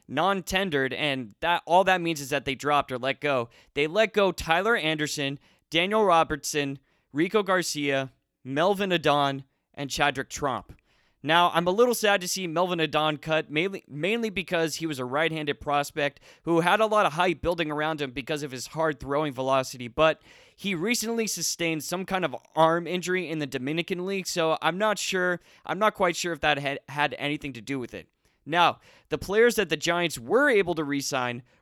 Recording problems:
none

